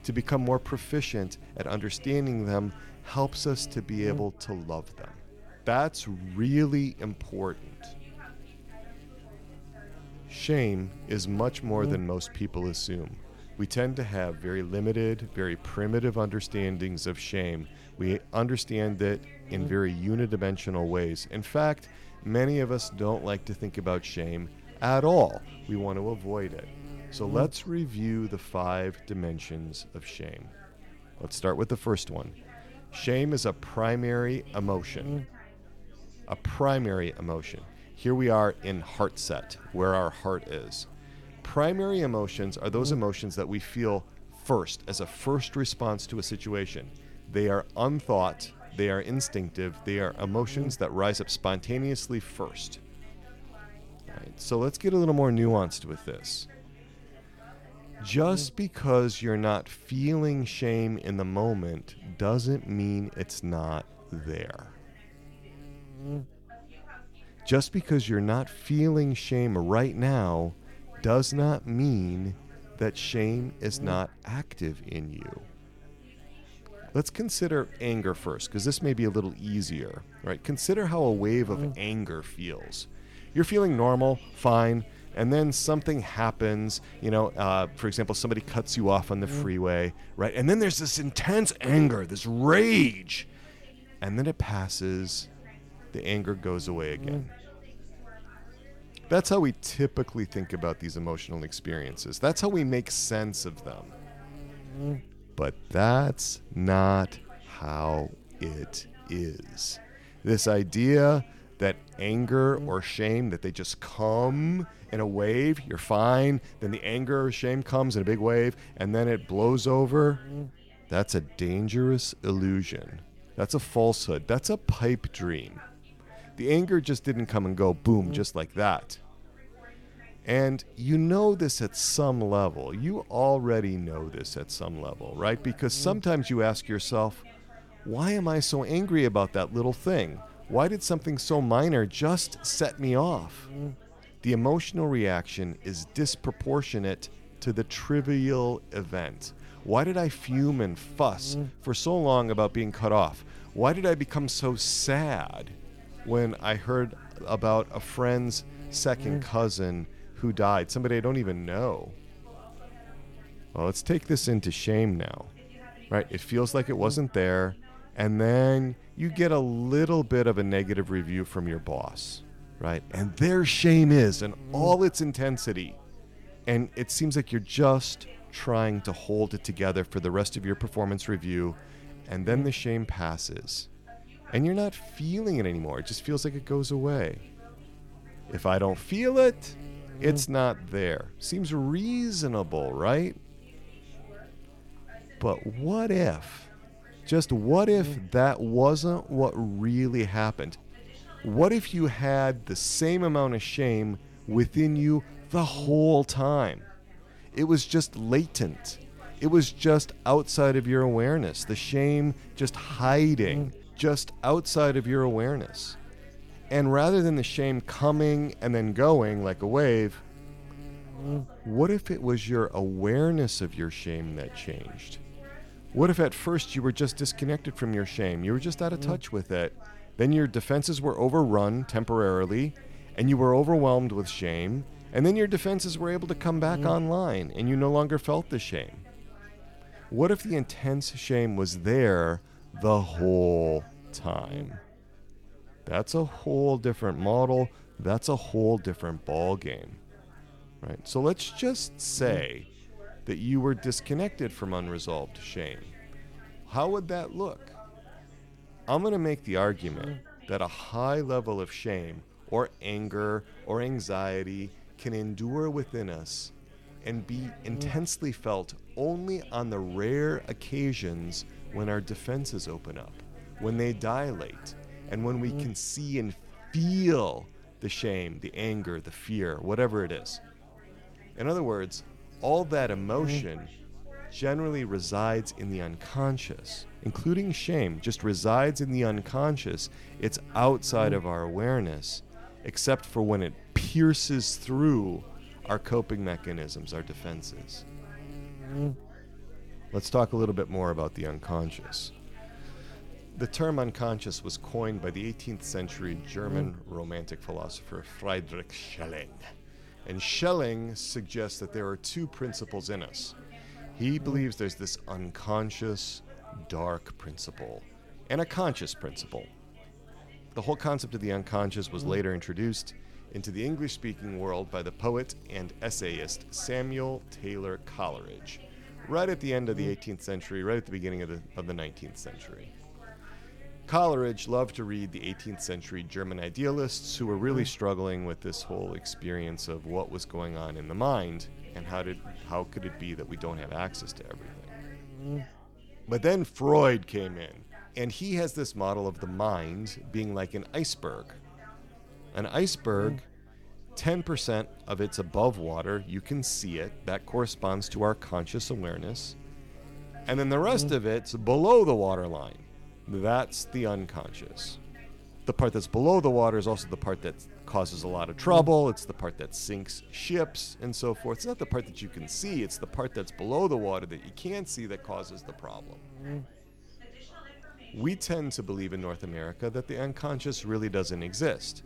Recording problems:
electrical hum; faint; throughout; 50 Hz, 25 dB below the speech
chatter from many people; faint; throughout; 25 dB below the speech

